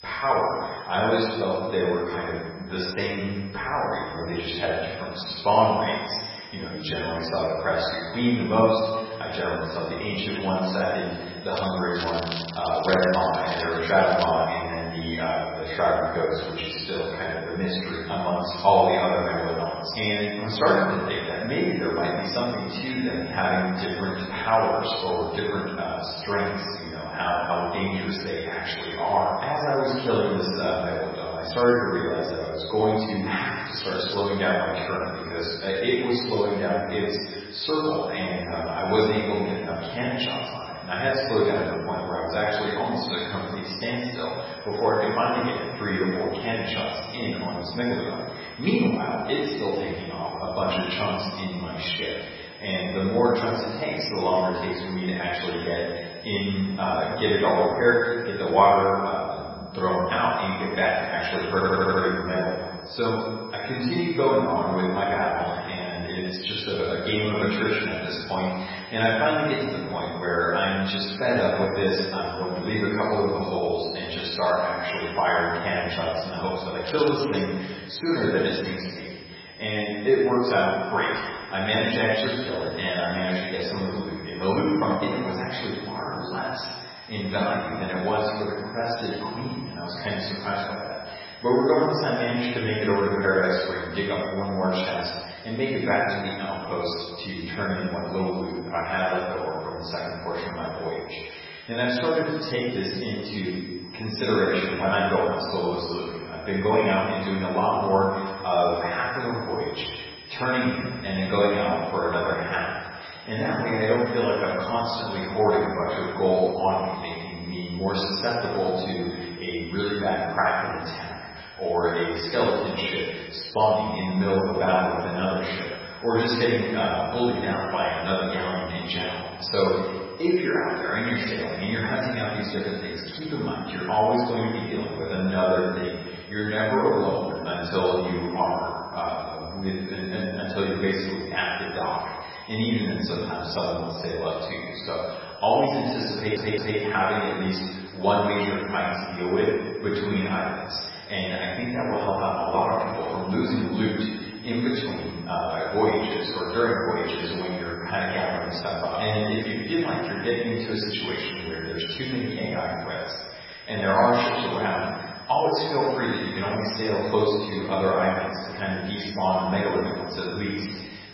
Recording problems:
room echo; strong; dies away in 1.3 s
off-mic speech; far
garbled, watery; badly; nothing above 5.5 kHz
high-pitched whine; noticeable; throughout; 5 kHz, 20 dB below the speech
crackling; noticeable; from 12 to 14 s and at 1:17; 10 dB below the speech
audio stuttering; at 1:02 and at 2:26

